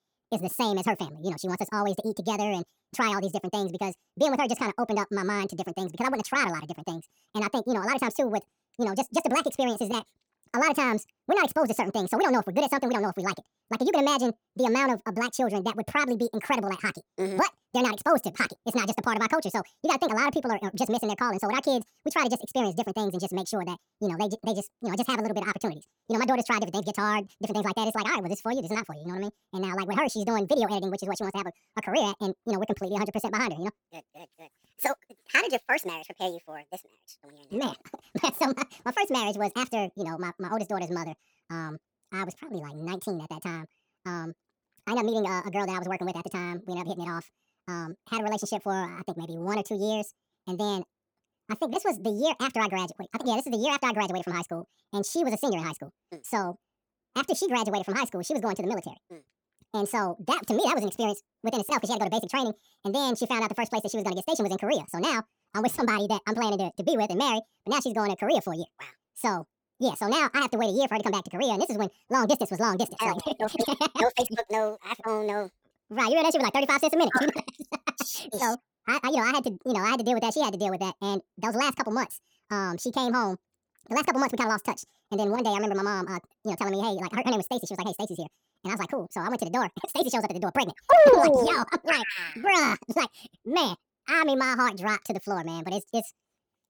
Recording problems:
wrong speed and pitch; too fast and too high; 1.7 times normal speed

